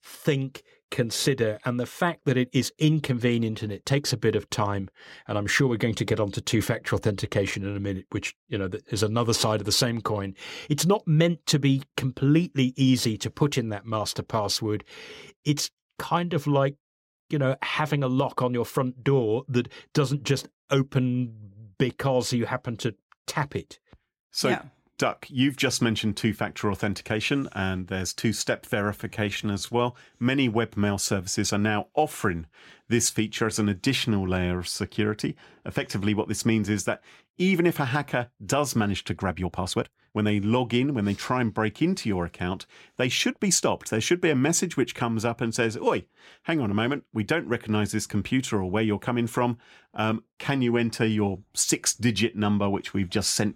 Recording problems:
uneven, jittery; strongly; from 4 to 50 s

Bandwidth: 16 kHz